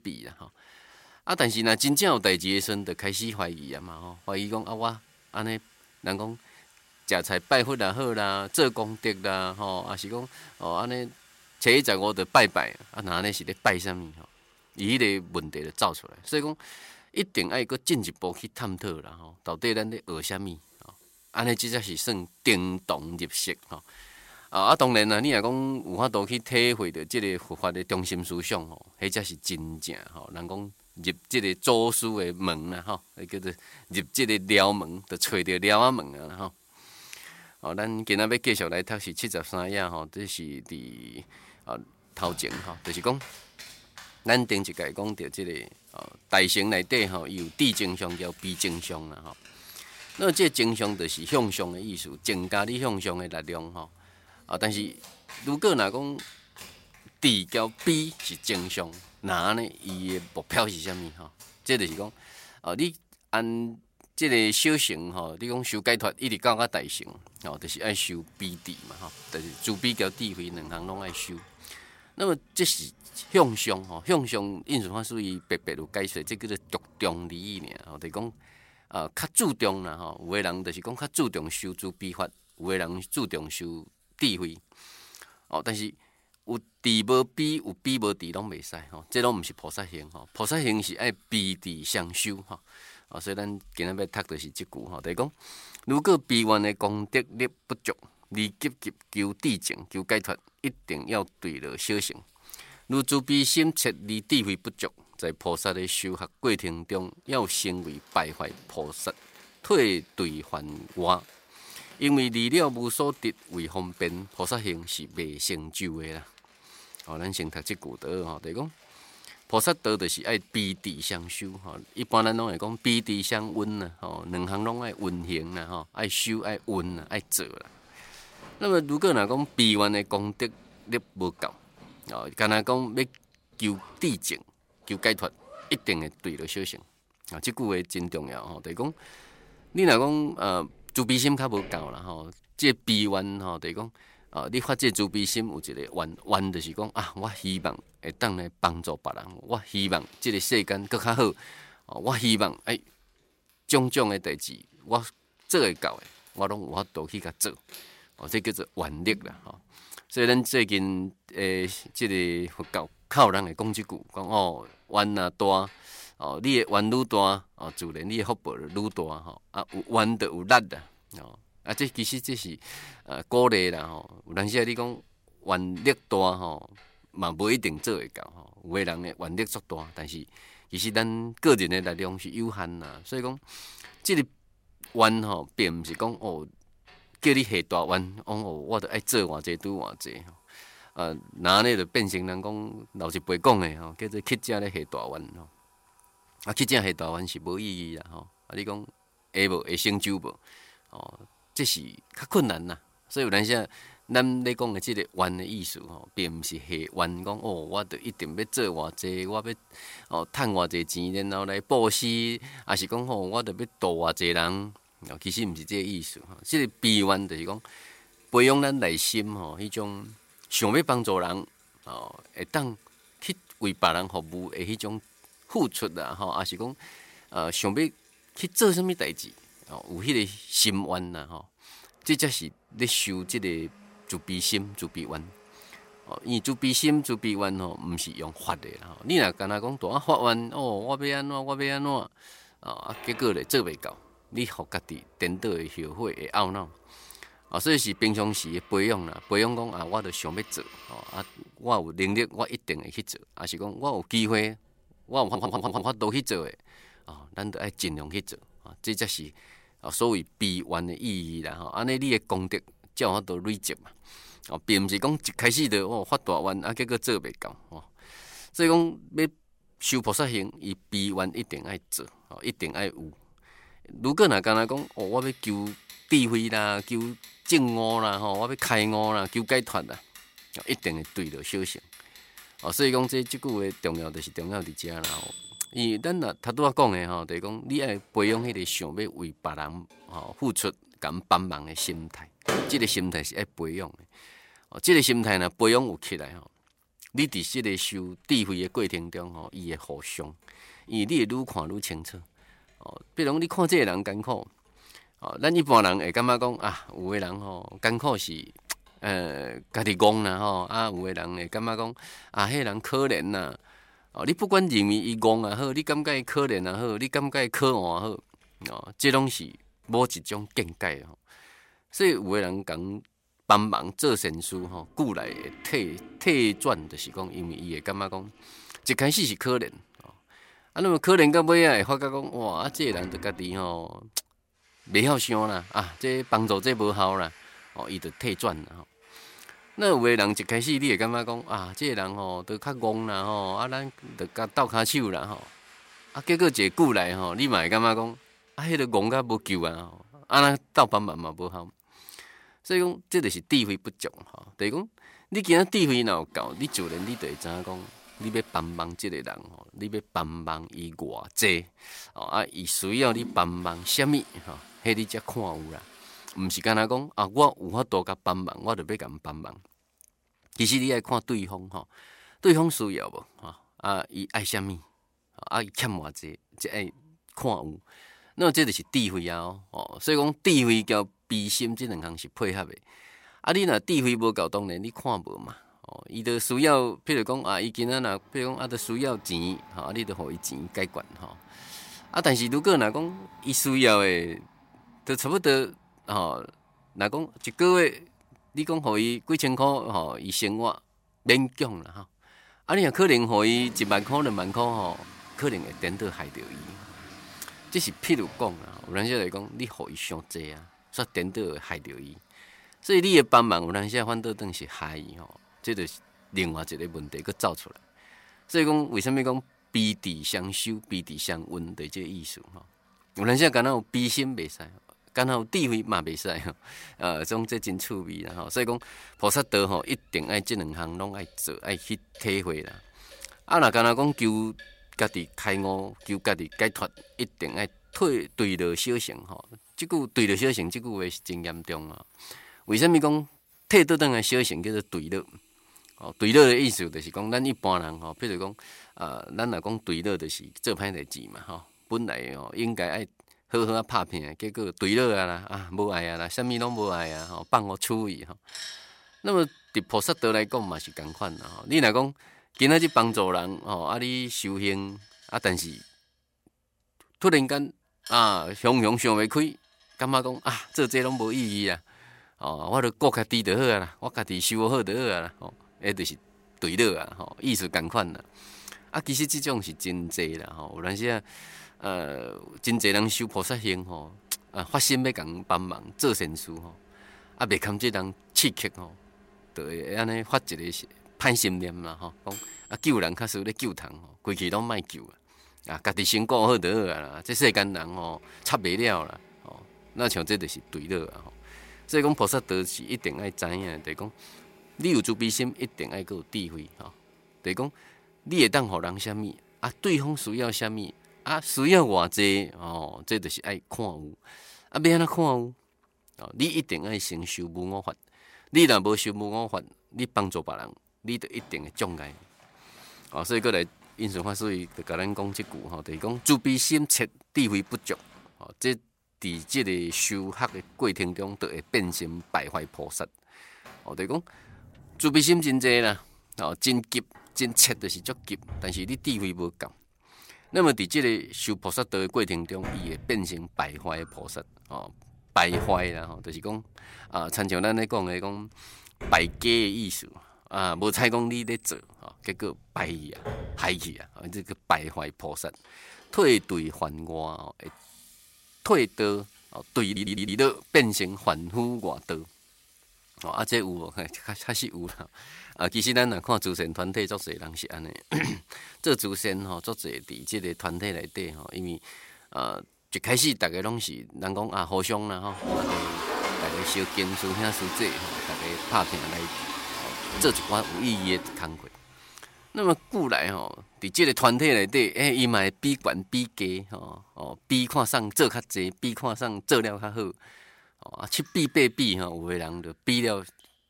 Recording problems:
household noises; noticeable; throughout; 20 dB below the speech
audio stuttering; at 4:15 and at 9:20

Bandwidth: 16 kHz